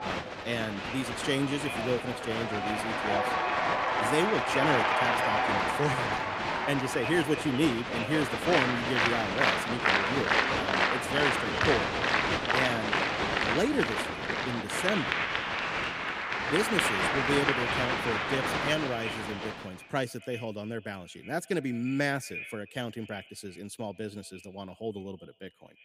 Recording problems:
echo of what is said; noticeable; throughout; 110 ms later, 10 dB below the speech
crowd noise; very loud; until 20 s; 4 dB above the speech

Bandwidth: 15 kHz